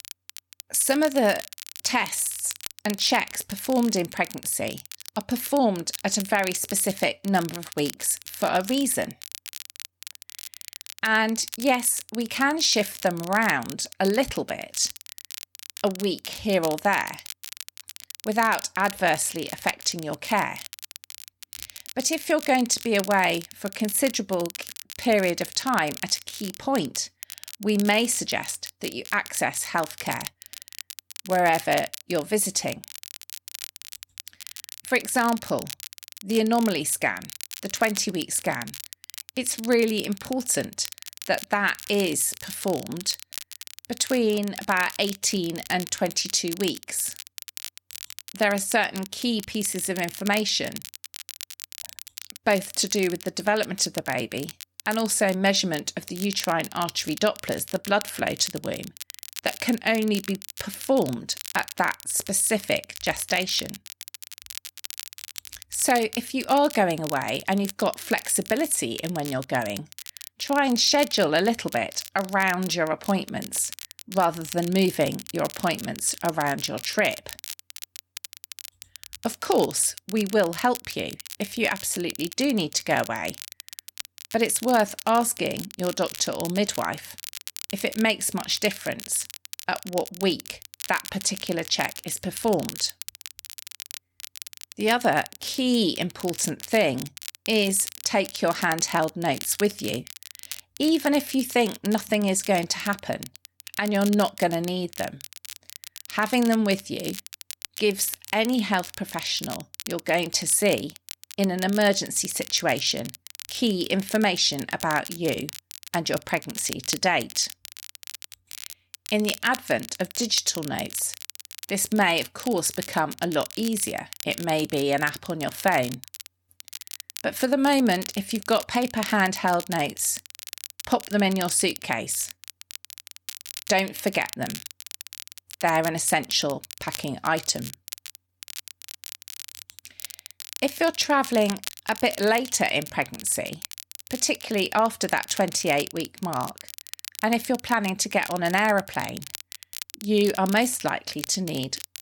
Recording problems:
crackle, like an old record; noticeable; 15 dB below the speech

